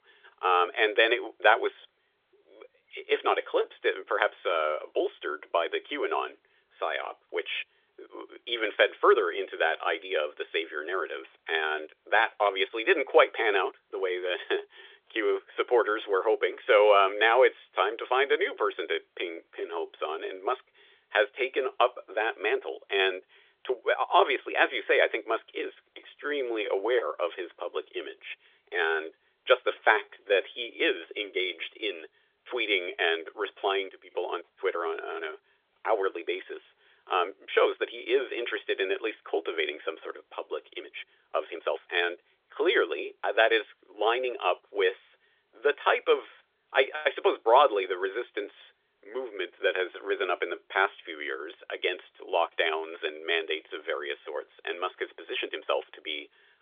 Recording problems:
phone-call audio; nothing above 3.5 kHz
uneven, jittery; strongly; from 12 to 56 s

